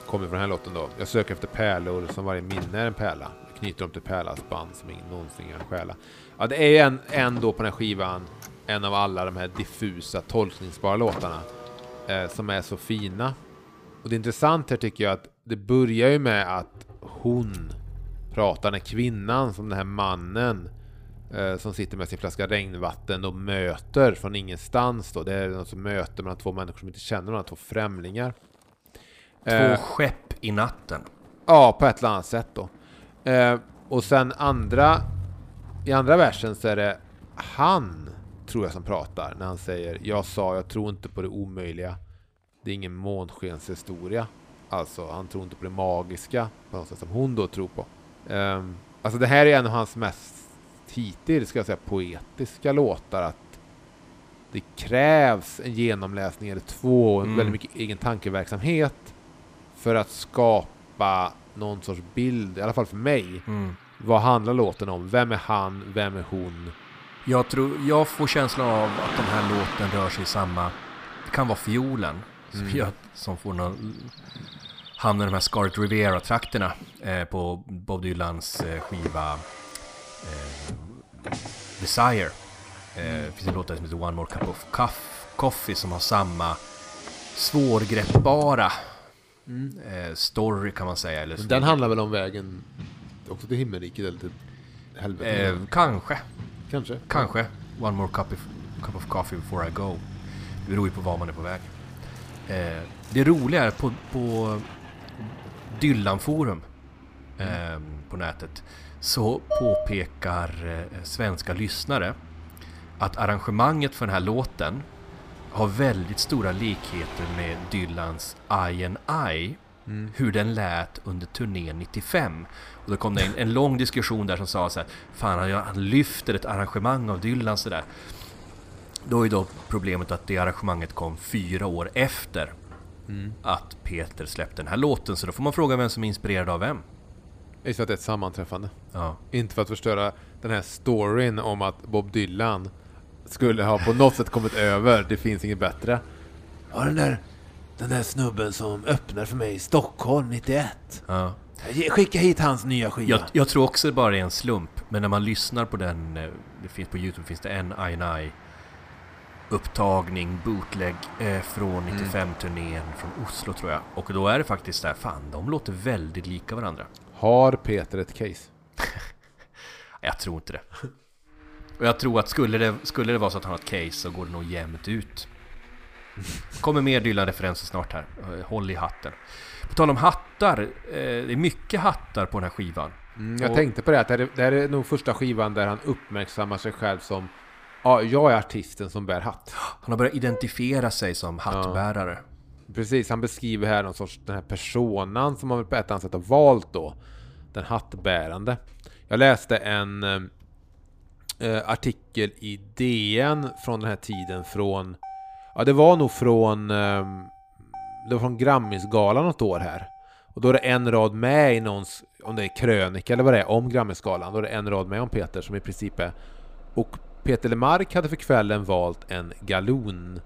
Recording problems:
traffic noise; noticeable; throughout; 15 dB below the speech
clattering dishes; loud; at 1:50; peak 1 dB above the speech

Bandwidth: 15 kHz